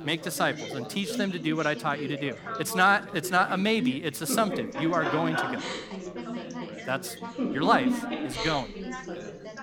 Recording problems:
background chatter; loud; throughout; 4 voices, 6 dB below the speech

